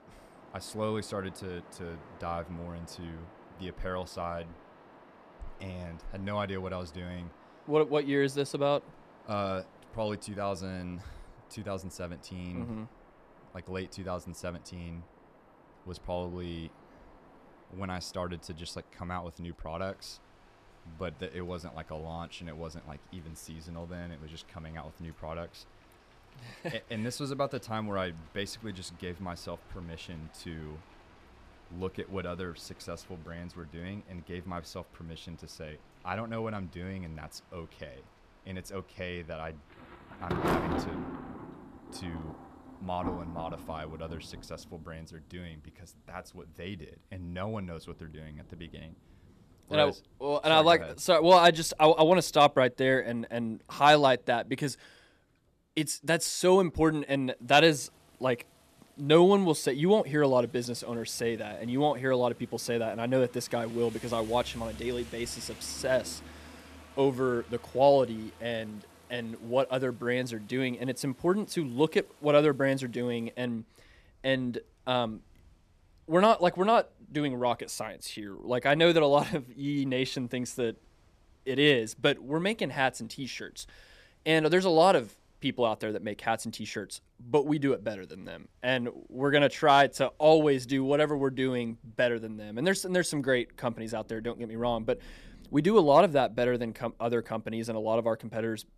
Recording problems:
rain or running water; faint; throughout; 20 dB below the speech

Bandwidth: 14 kHz